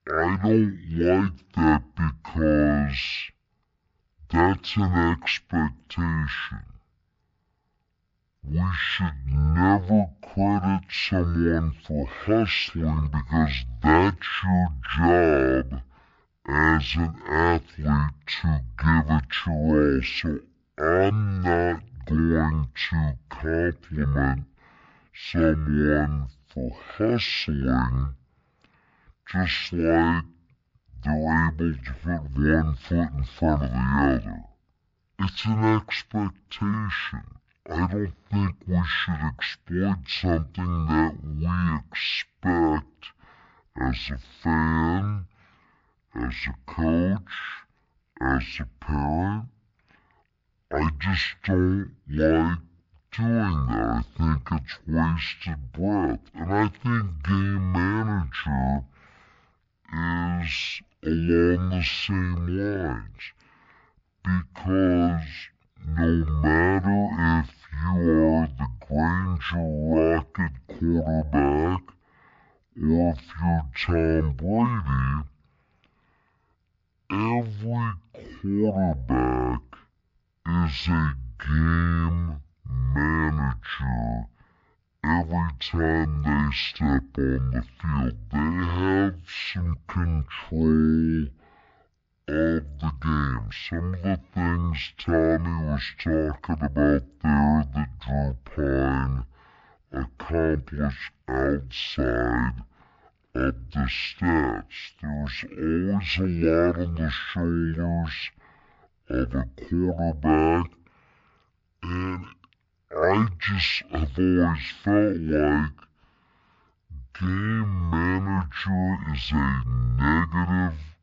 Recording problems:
wrong speed and pitch; too slow and too low; 0.5 times normal speed

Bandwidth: 7.5 kHz